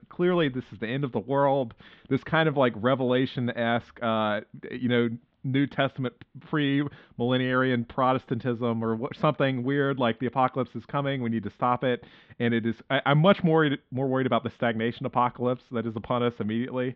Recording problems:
muffled; very slightly; fading above 3.5 kHz

